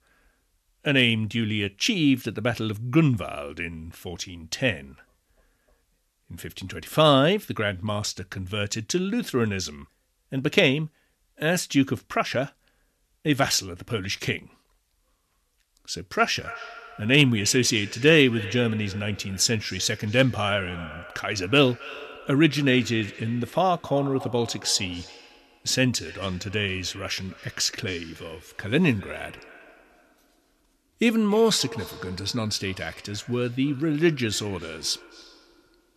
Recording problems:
echo of what is said; faint; from 16 s on; 270 ms later, 20 dB below the speech

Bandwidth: 13.5 kHz